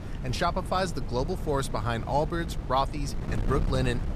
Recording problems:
wind noise on the microphone; occasional gusts; 15 dB below the speech

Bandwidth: 14.5 kHz